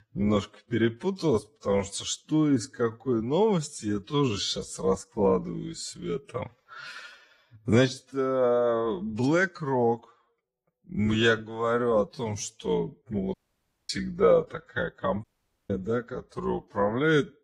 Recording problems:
wrong speed, natural pitch; too slow; 0.6 times normal speed
garbled, watery; slightly
audio cutting out; at 13 s for 0.5 s and at 15 s

